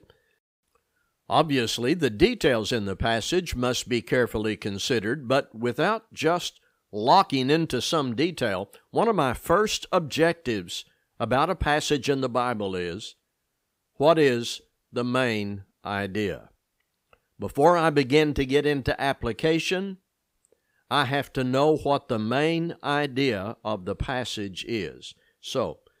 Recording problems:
none

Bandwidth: 15.5 kHz